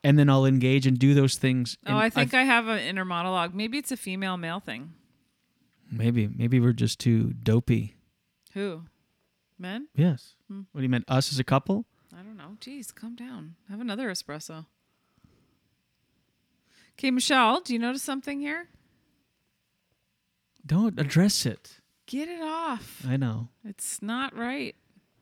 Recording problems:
none

